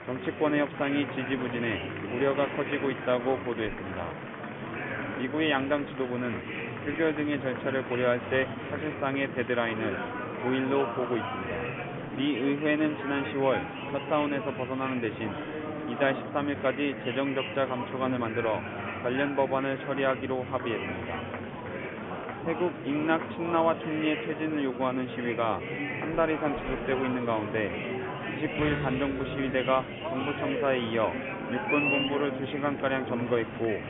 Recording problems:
high frequencies cut off; severe; nothing above 3.5 kHz
murmuring crowd; loud; throughout; 5 dB below the speech

